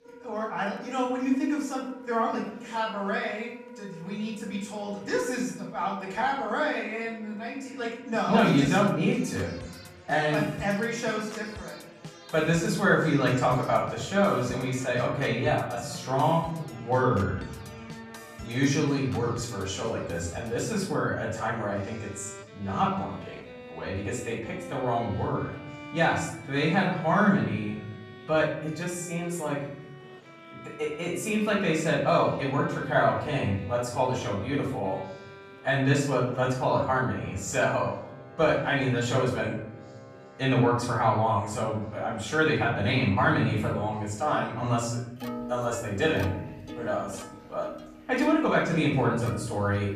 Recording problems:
off-mic speech; far
room echo; noticeable; dies away in 0.9 s
background music; noticeable; throughout; 15 dB below the speech
chatter from many people; faint; throughout; 30 dB below the speech

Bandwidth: 14.5 kHz